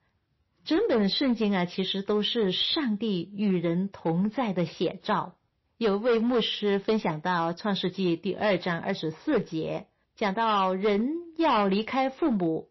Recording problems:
distortion; slight; 7% of the sound clipped
garbled, watery; slightly; nothing above 5.5 kHz

